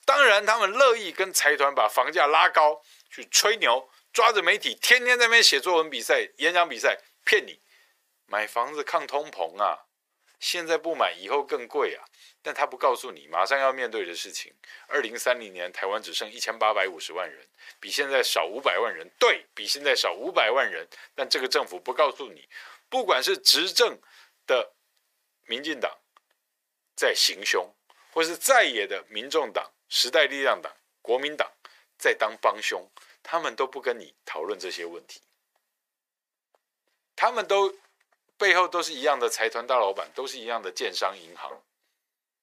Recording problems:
thin; very; fading below 550 Hz

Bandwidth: 15 kHz